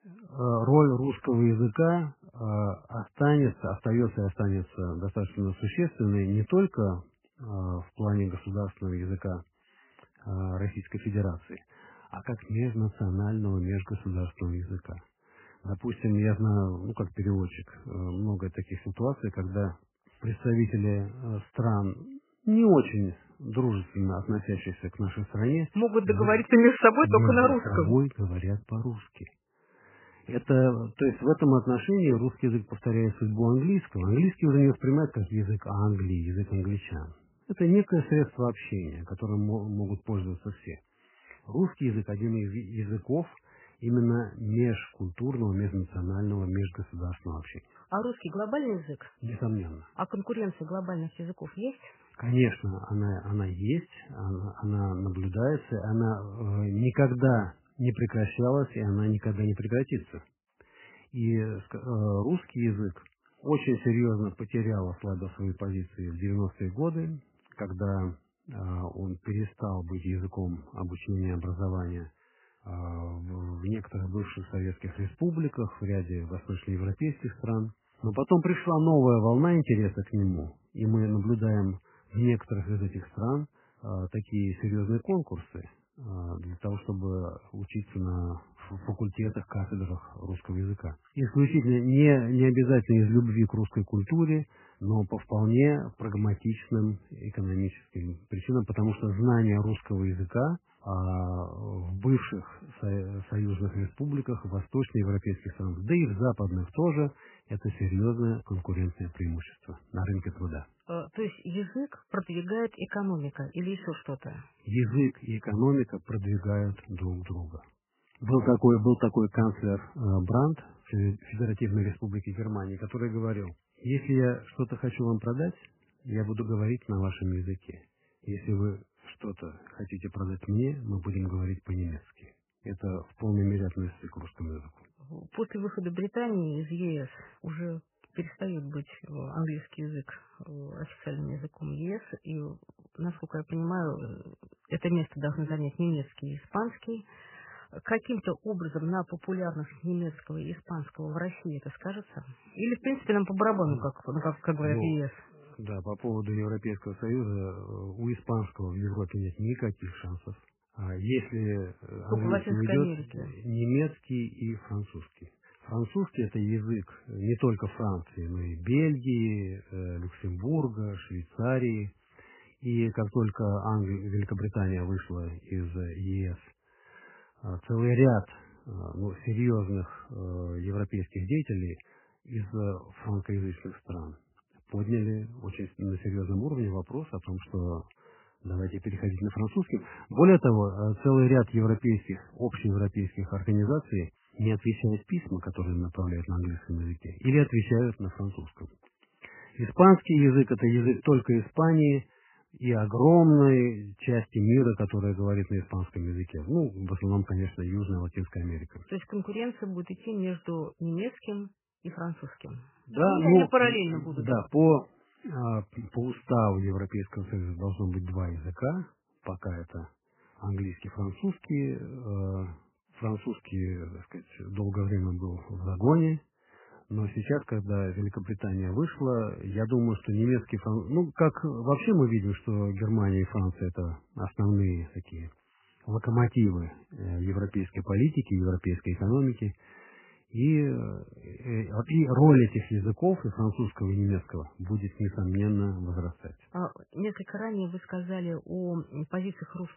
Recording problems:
garbled, watery; badly; nothing above 3 kHz

